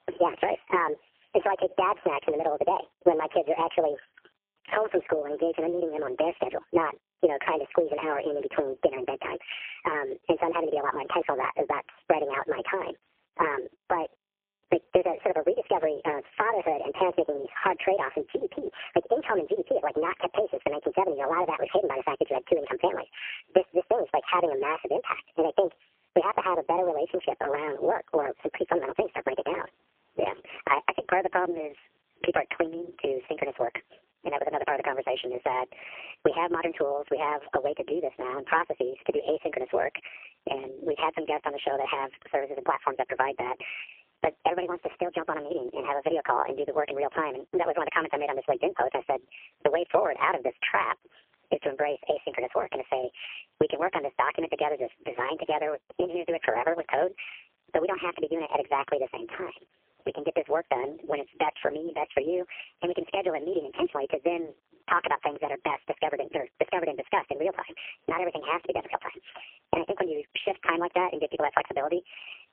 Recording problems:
phone-call audio; poor line; nothing above 3 kHz
wrong speed and pitch; too fast and too high; 1.5 times normal speed
squashed, flat; somewhat

